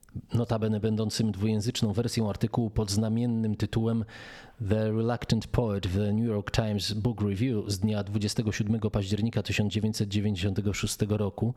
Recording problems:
squashed, flat; somewhat

